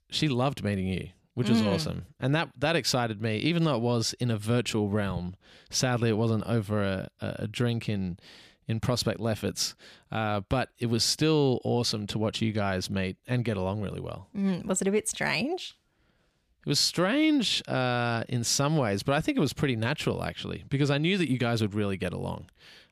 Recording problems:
none

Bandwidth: 14.5 kHz